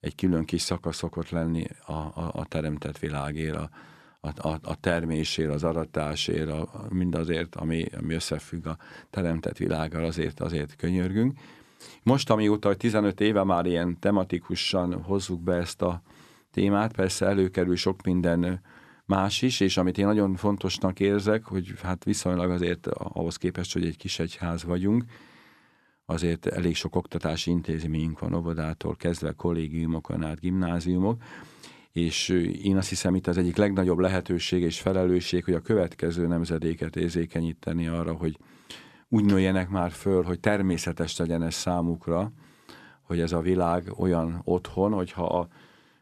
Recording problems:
none

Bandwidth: 13.5 kHz